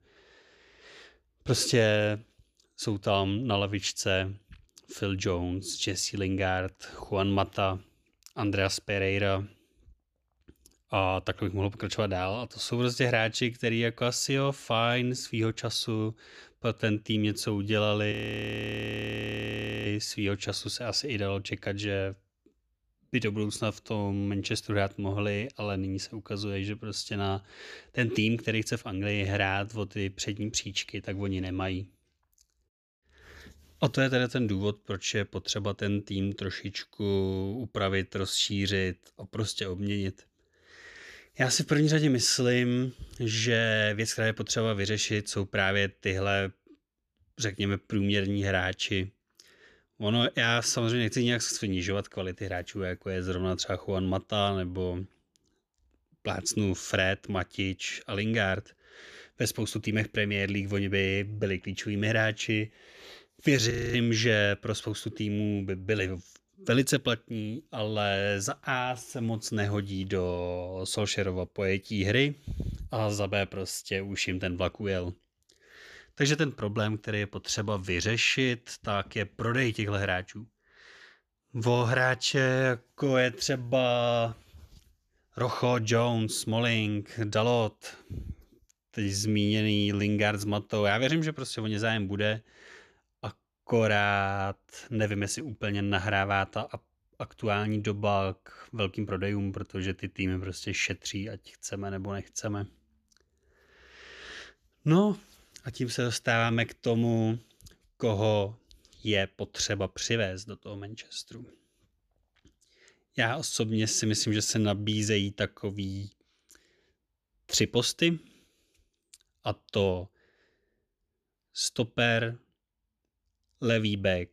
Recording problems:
audio freezing; at 18 s for 1.5 s and at 1:04

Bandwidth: 14.5 kHz